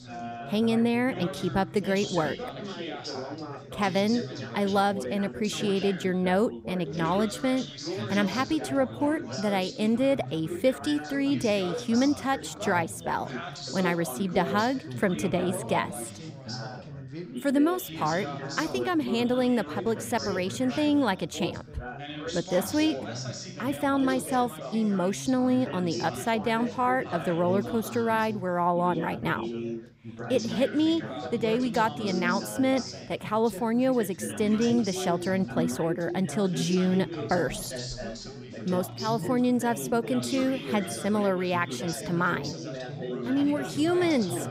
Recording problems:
background chatter; loud; throughout; 4 voices, 9 dB below the speech

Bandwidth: 15.5 kHz